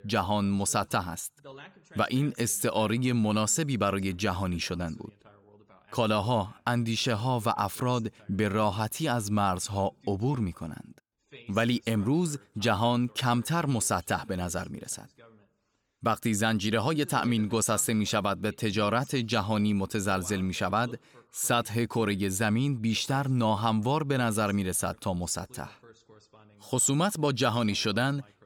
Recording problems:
voice in the background; faint; throughout; 25 dB below the speech

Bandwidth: 18 kHz